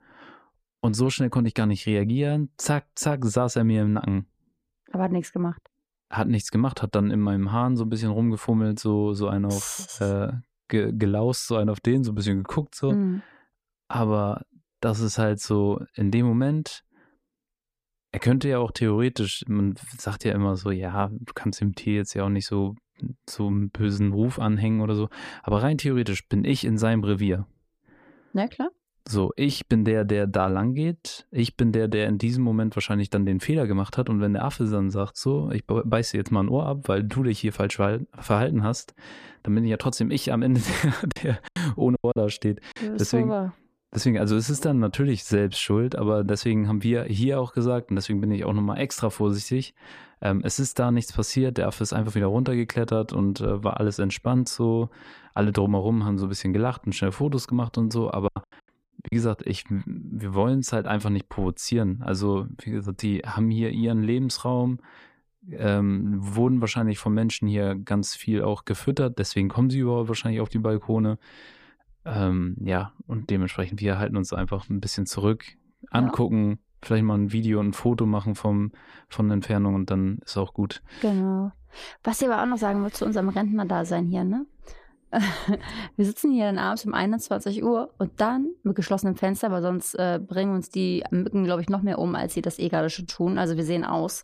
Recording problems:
choppy; very; from 41 to 43 s and at 58 s; 8% of the speech affected

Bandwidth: 15 kHz